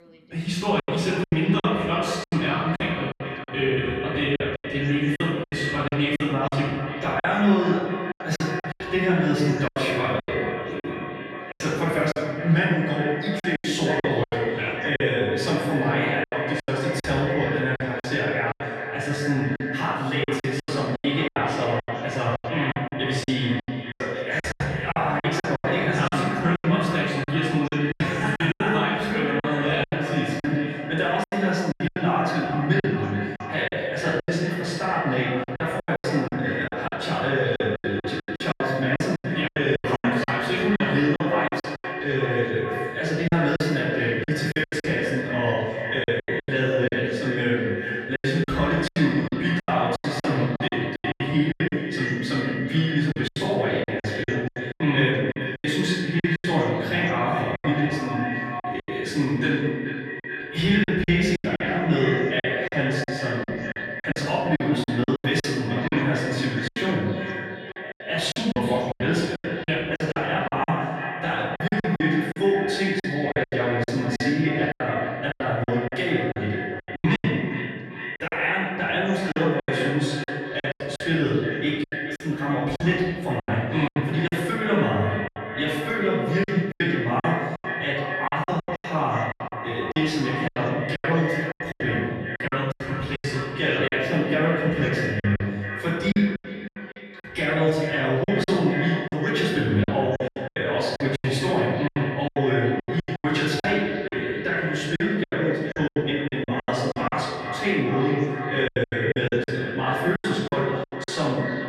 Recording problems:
echo of what is said; strong; throughout; 430 ms later, 7 dB below the speech
off-mic speech; far
room echo; noticeable; dies away in 1.3 s
voice in the background; faint; throughout; 30 dB below the speech
choppy; very; 13% of the speech affected

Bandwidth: 14 kHz